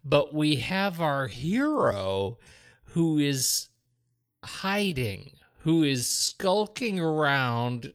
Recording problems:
wrong speed, natural pitch; too slow; 0.6 times normal speed

